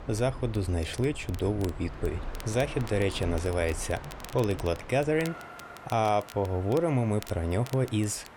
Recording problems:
train or aircraft noise; noticeable; throughout; 15 dB below the speech
crackle, like an old record; faint; 20 dB below the speech

